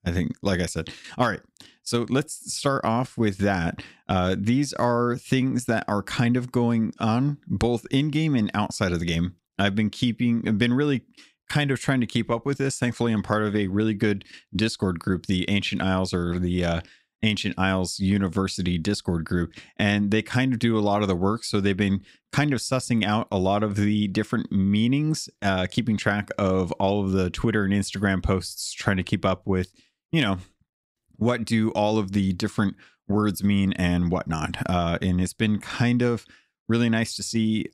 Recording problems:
none

